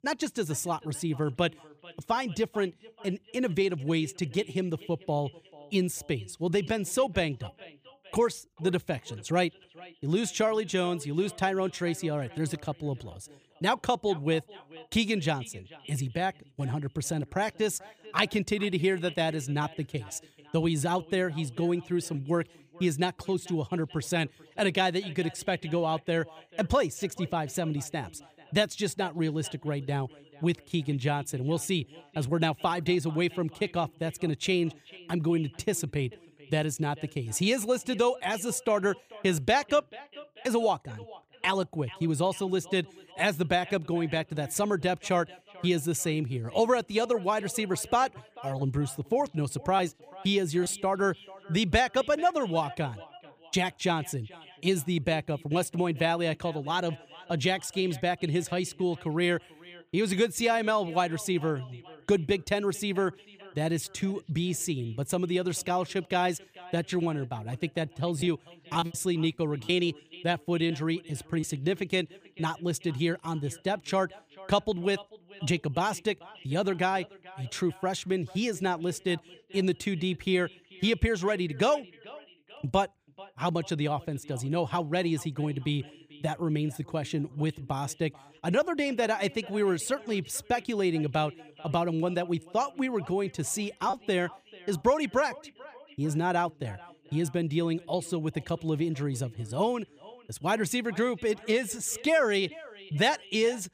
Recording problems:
echo of what is said; faint; throughout; 440 ms later, 20 dB below the speech
choppy; very; from 1:08 to 1:11; 7% of the speech affected

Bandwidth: 15 kHz